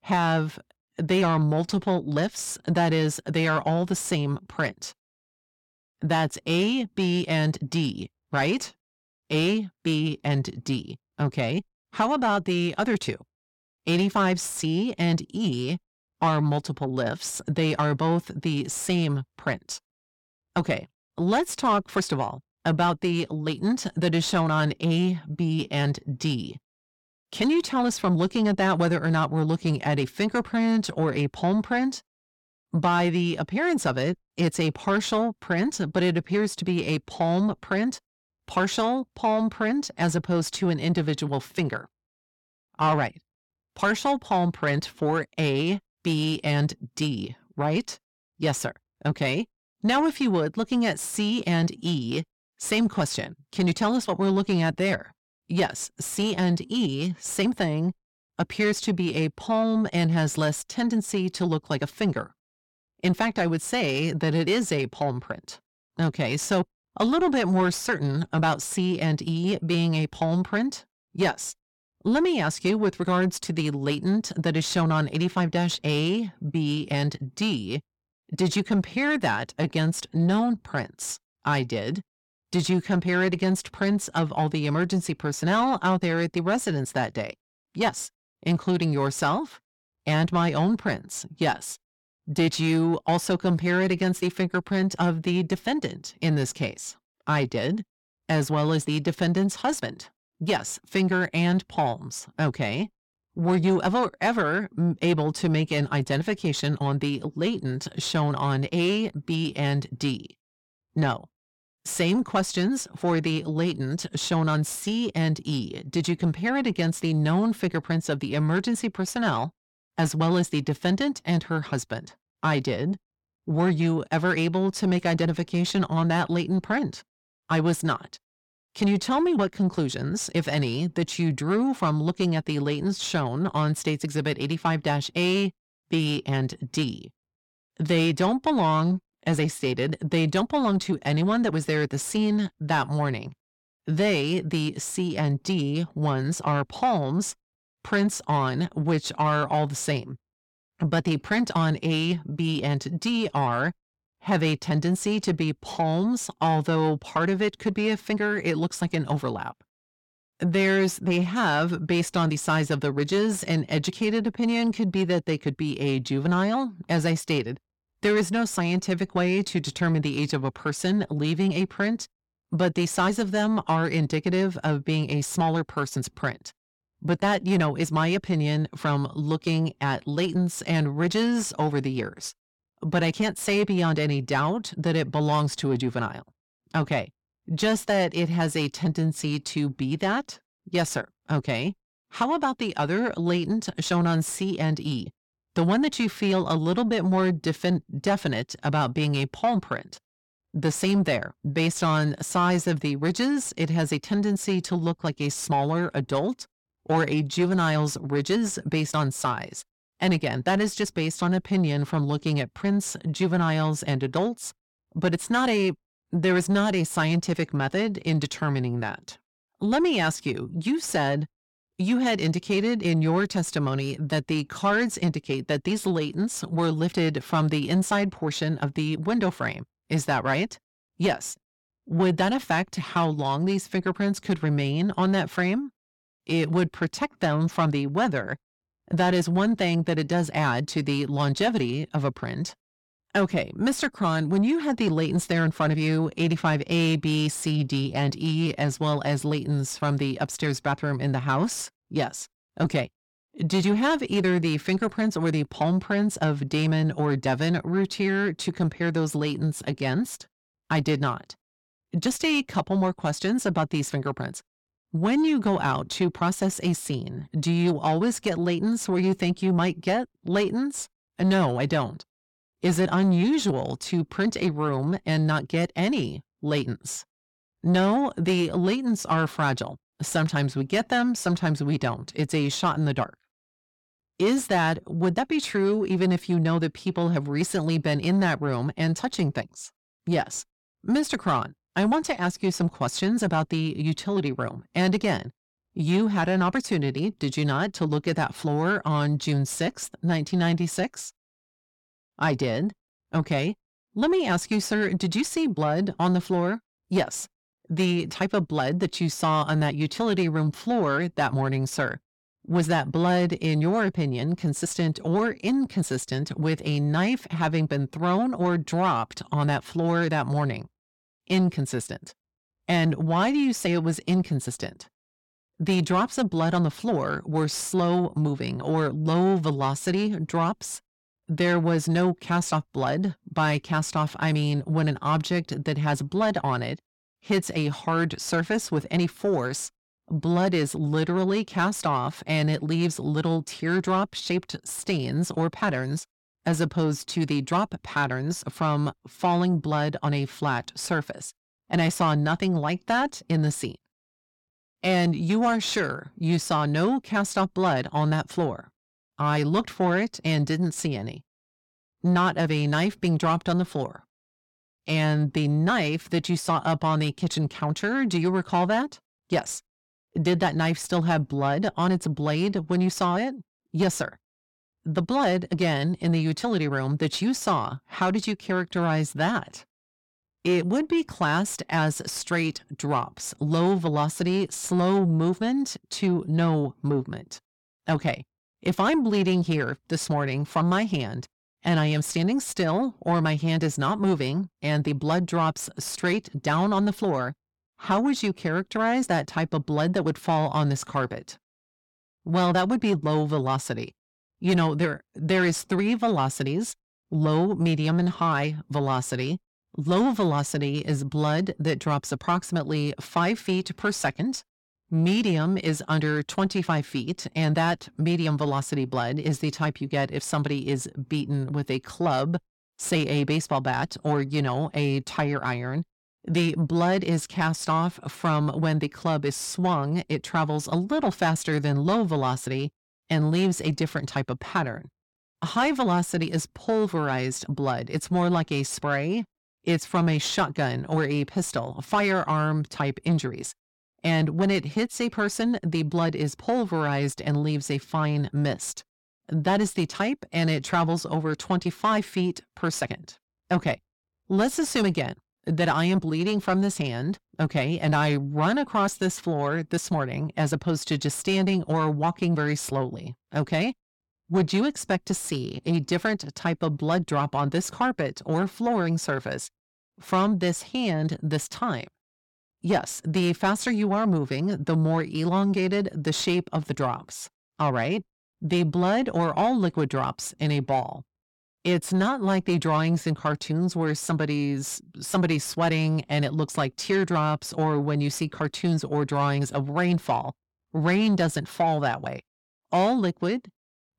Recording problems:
distortion; slight; 10 dB below the speech

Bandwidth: 17 kHz